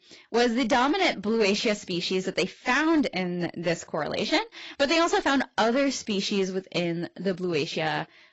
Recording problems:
garbled, watery; badly; nothing above 7.5 kHz
distortion; slight; 6% of the sound clipped

